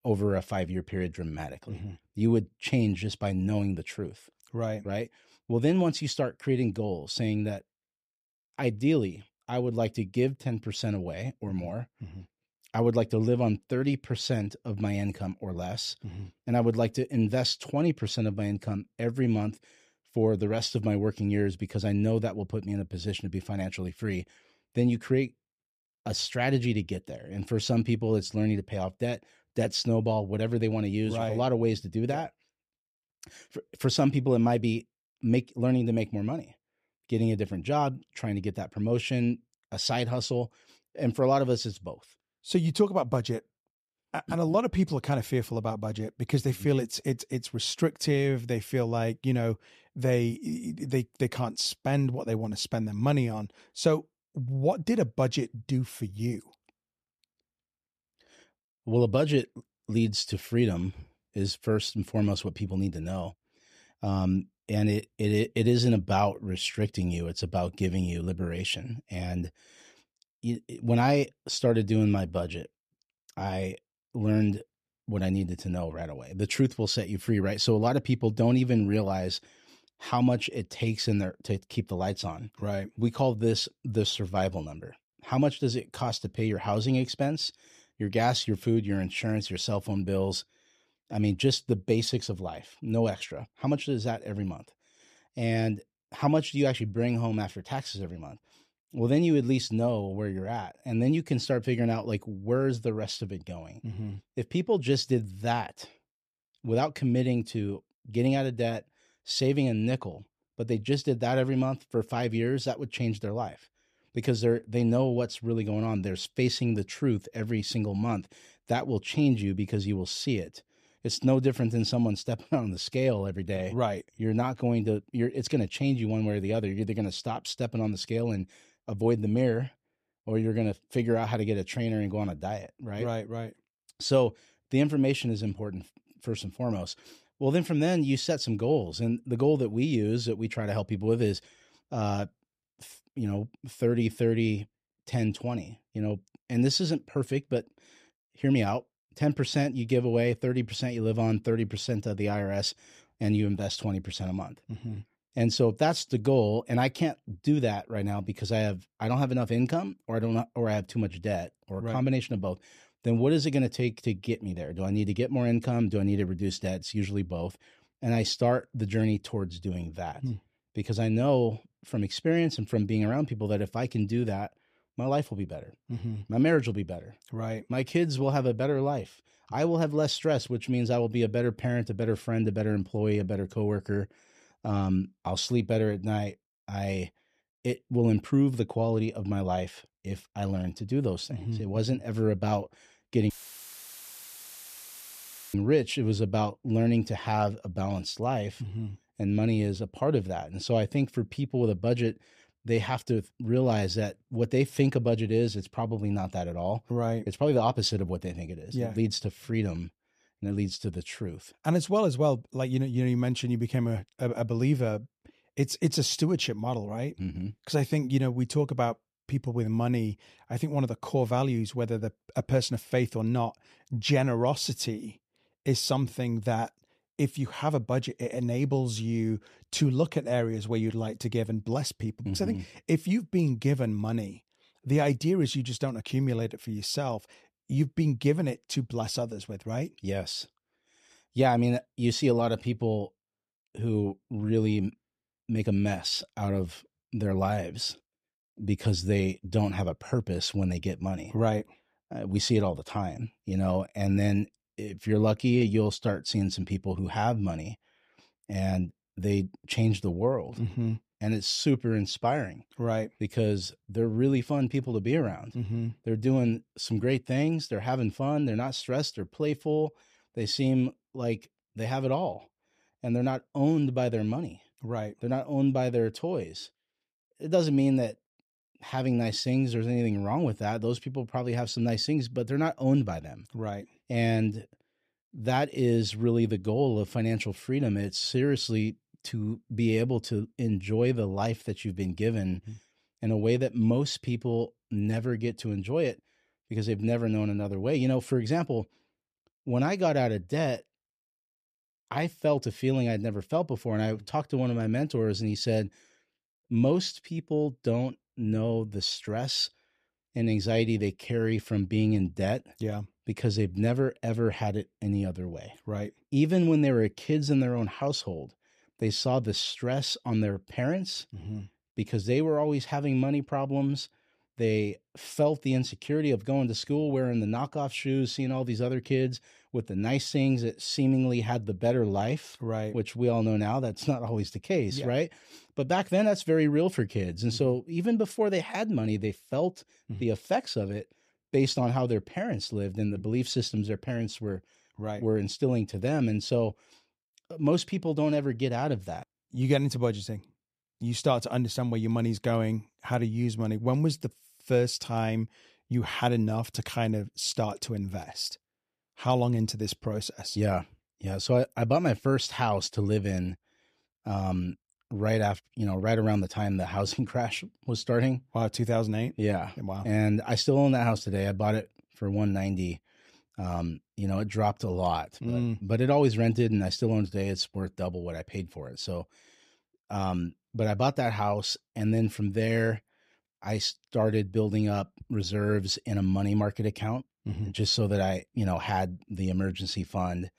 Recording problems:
audio cutting out; filled with static; at 3:13 for 2 s

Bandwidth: 14.5 kHz